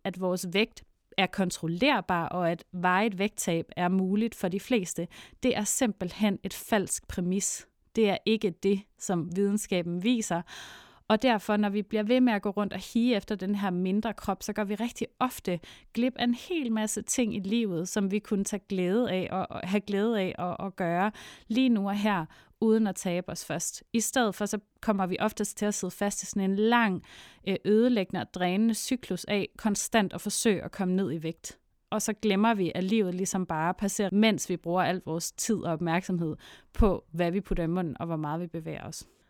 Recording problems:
none

